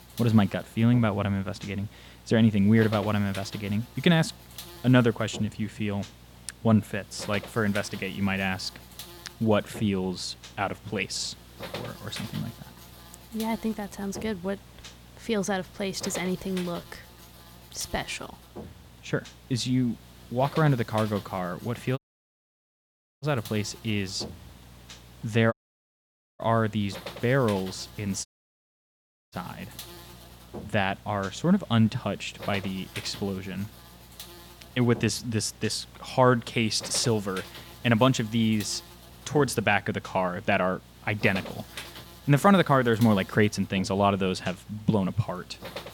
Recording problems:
electrical hum; noticeable; throughout; 60 Hz, 15 dB below the speech
audio cutting out; at 22 s for 1 s, at 26 s for 1 s and at 28 s for 1 s

